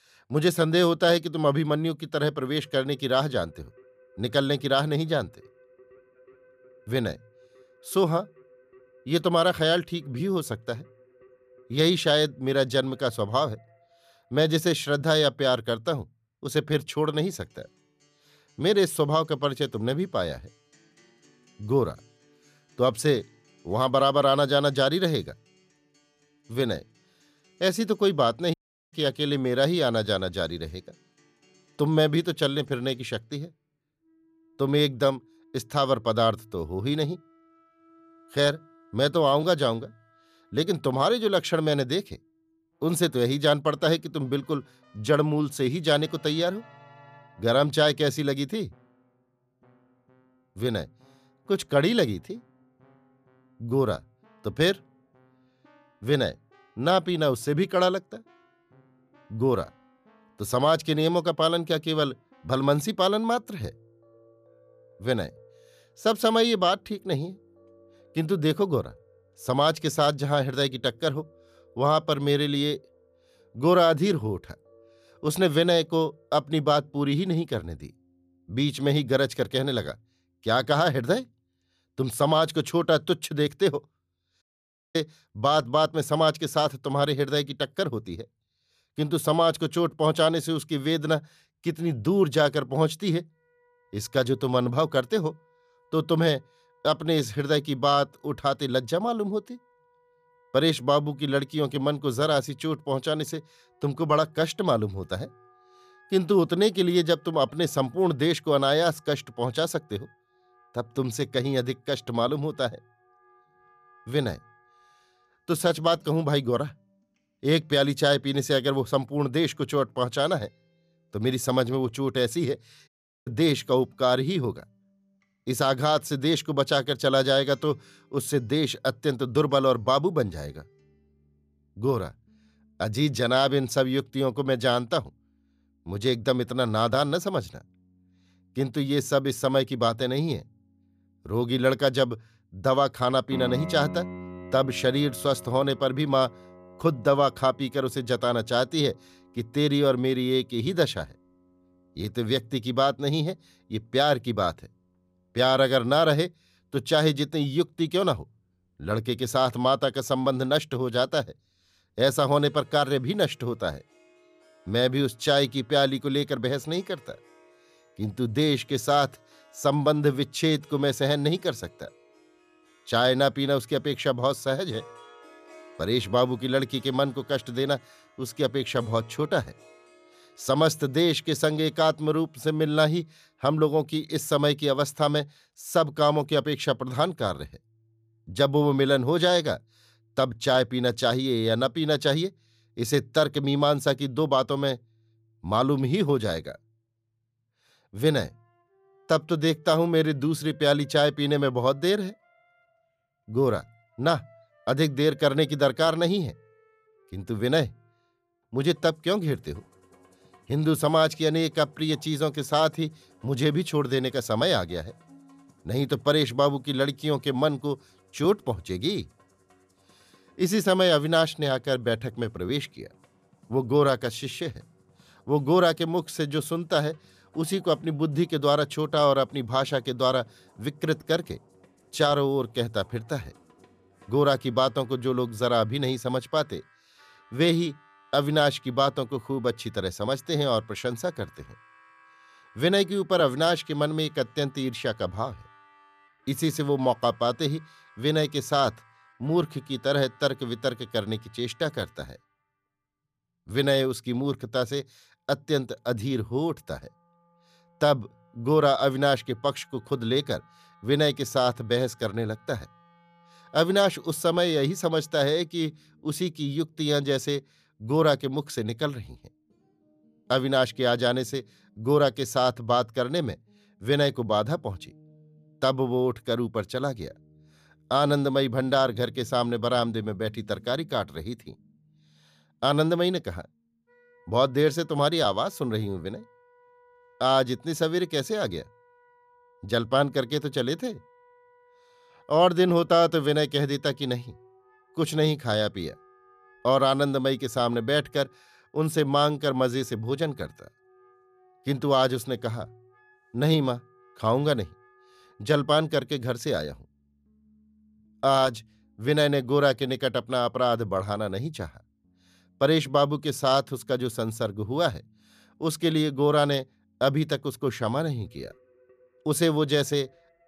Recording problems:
background music; faint; throughout; 30 dB below the speech
audio cutting out; at 29 s, at 1:24 for 0.5 s and at 2:03

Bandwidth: 14.5 kHz